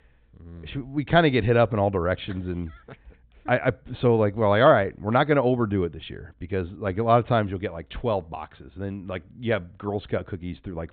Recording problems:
high frequencies cut off; severe; nothing above 4 kHz

